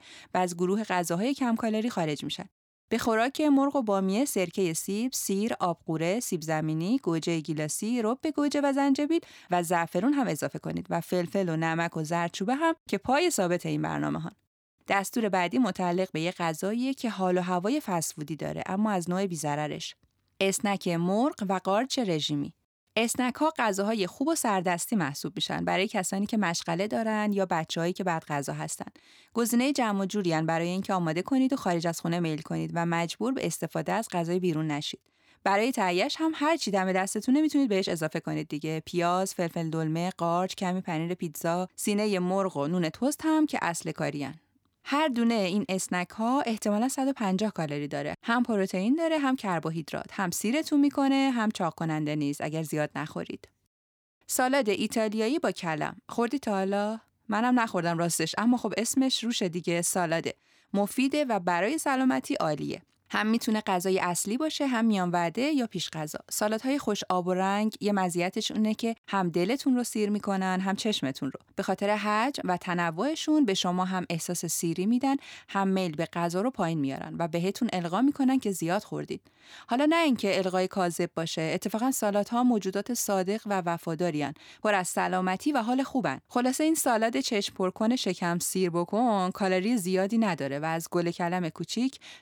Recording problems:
none

